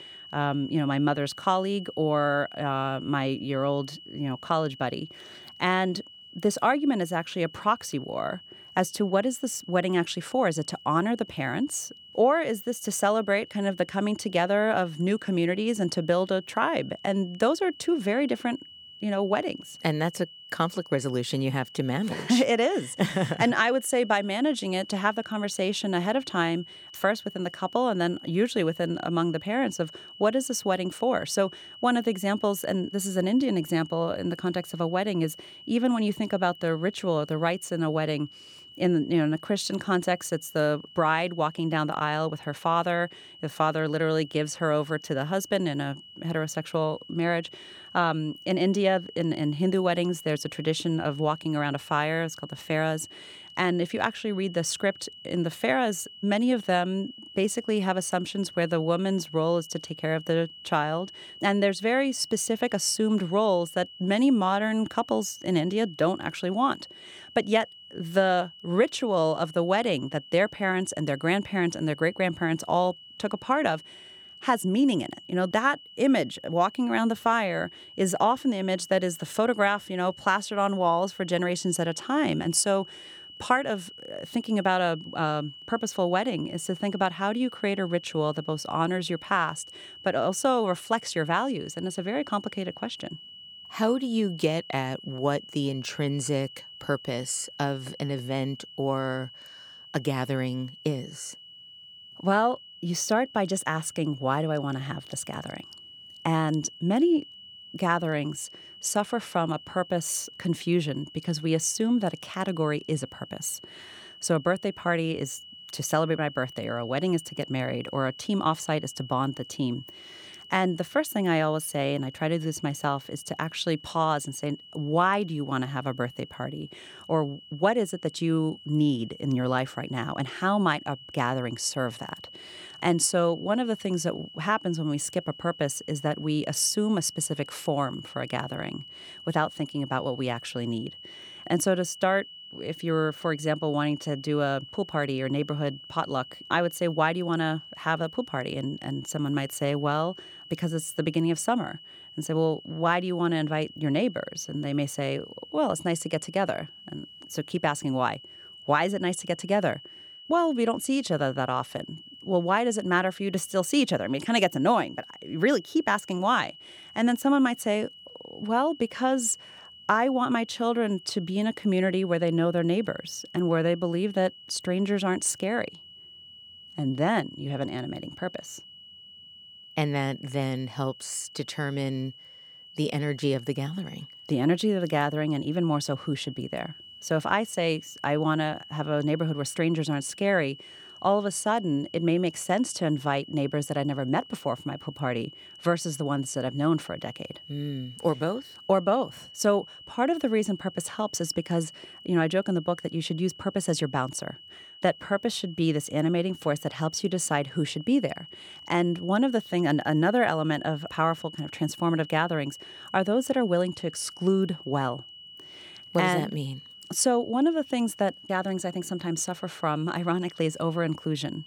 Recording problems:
high-pitched whine; noticeable; throughout; 3 kHz, 15 dB below the speech

